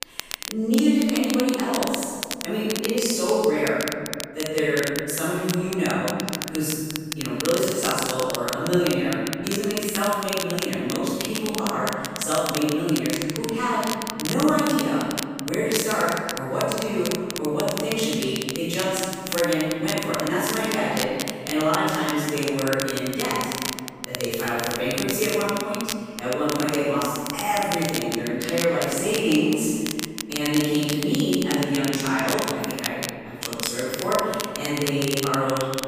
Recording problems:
room echo; strong; dies away in 2 s
off-mic speech; far
crackle, like an old record; very faint; 7 dB below the speech

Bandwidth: 15 kHz